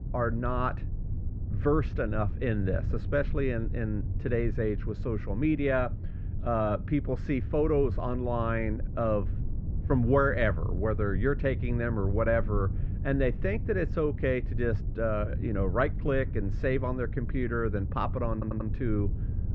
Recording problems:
muffled; very; fading above 2.5 kHz
low rumble; noticeable; throughout; 15 dB below the speech
audio stuttering; at 18 s

